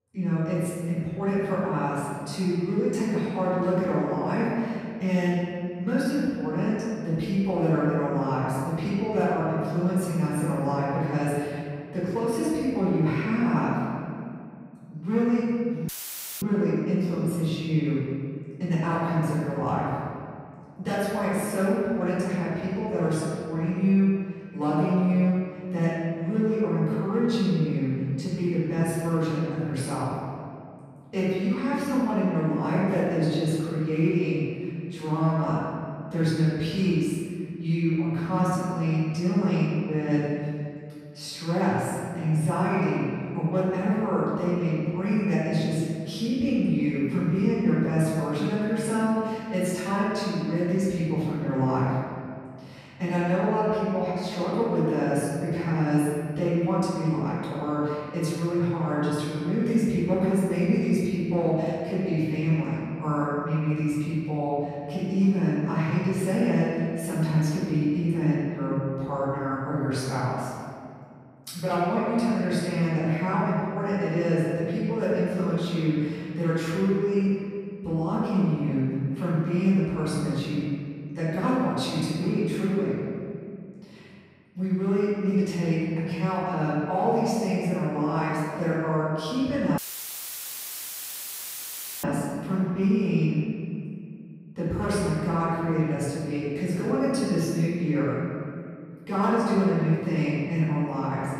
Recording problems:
room echo; strong; dies away in 2.1 s
off-mic speech; far
audio cutting out; filled with static; at 16 s for 0.5 s and at 1:30 for 2.5 s

